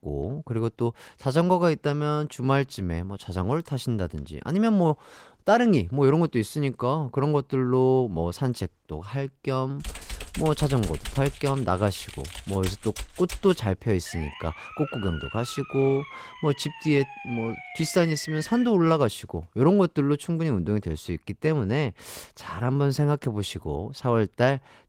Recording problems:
garbled, watery; slightly; nothing above 16.5 kHz
keyboard typing; noticeable; from 10 to 14 s; peak 9 dB below the speech
siren; faint; from 14 to 19 s; peak 10 dB below the speech

